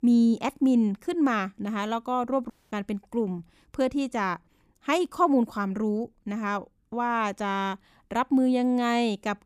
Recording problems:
audio cutting out; at 2.5 s

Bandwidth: 15 kHz